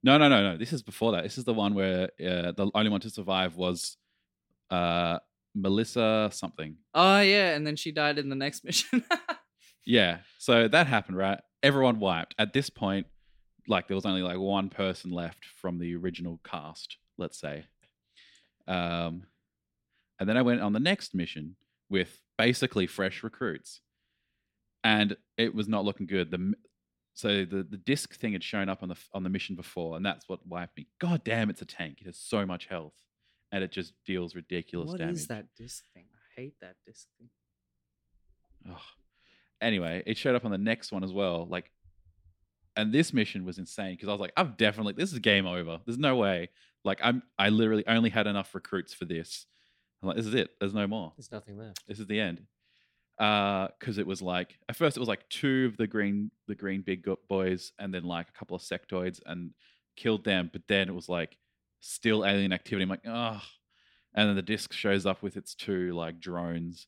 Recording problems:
none

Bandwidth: 16.5 kHz